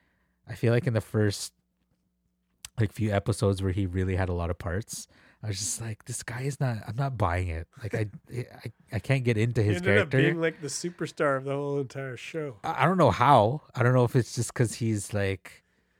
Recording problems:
none

